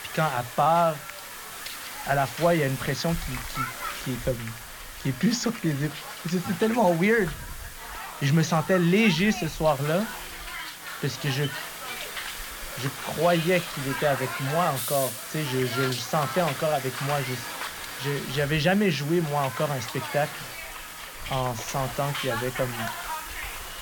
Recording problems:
high frequencies cut off; noticeable; nothing above 7 kHz
hiss; loud; throughout; 8 dB below the speech

